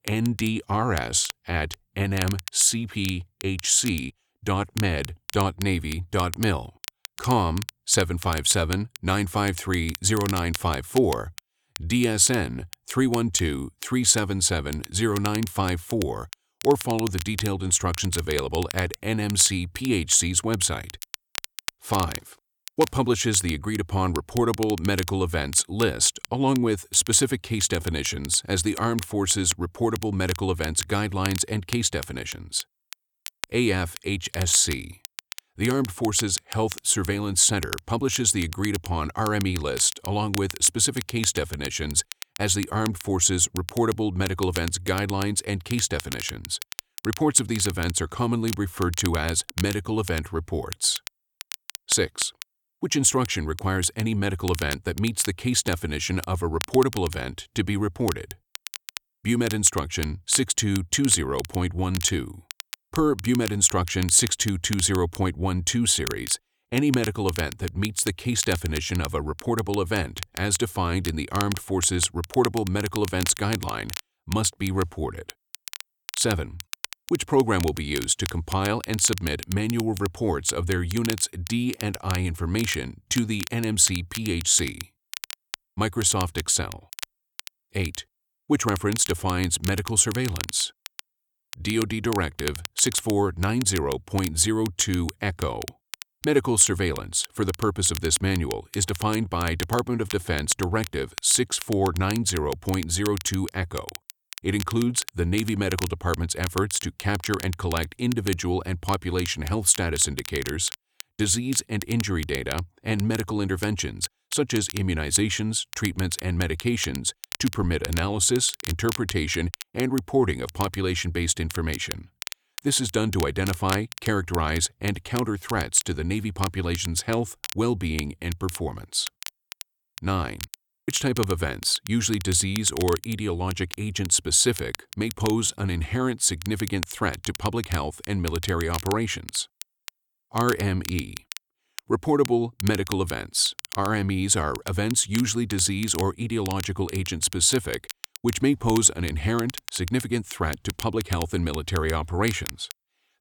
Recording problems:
crackle, like an old record; noticeable; 15 dB below the speech

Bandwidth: 18.5 kHz